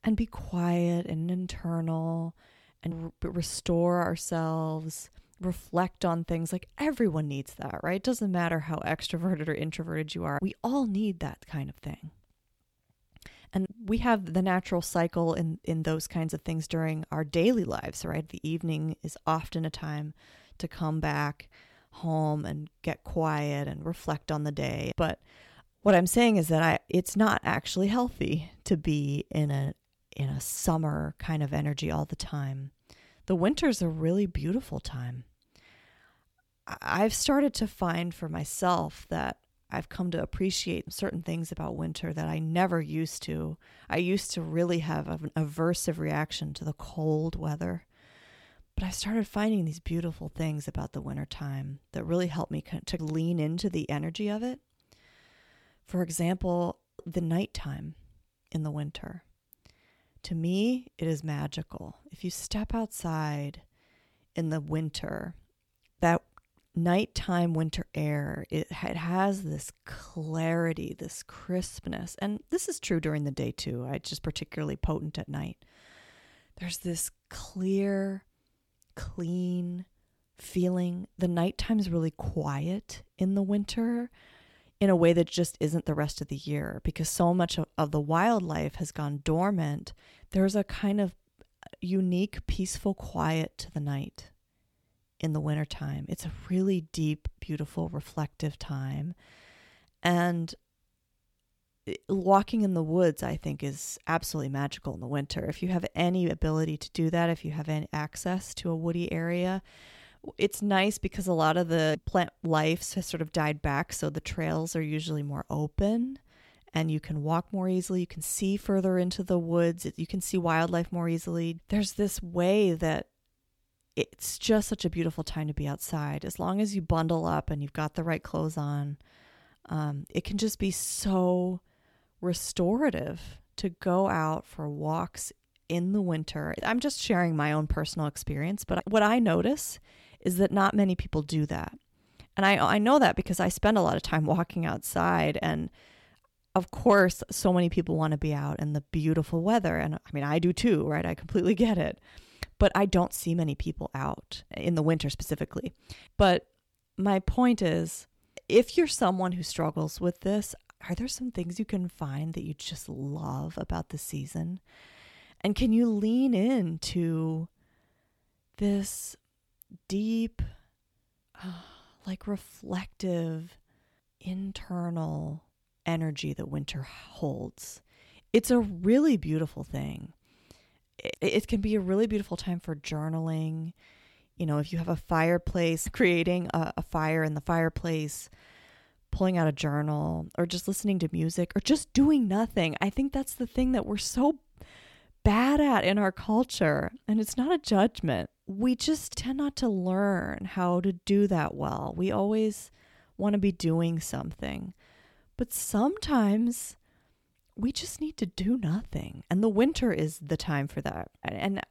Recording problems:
none

